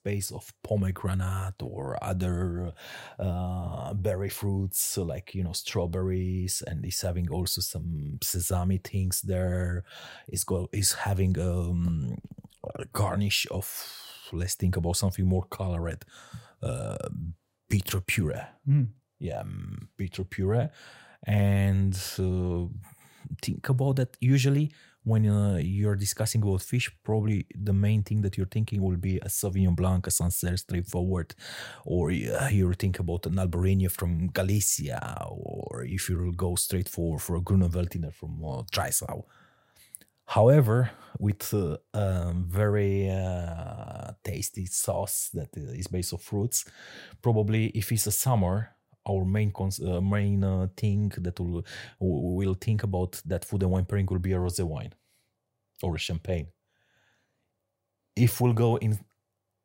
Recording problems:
uneven, jittery; slightly; from 1 to 46 s

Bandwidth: 16 kHz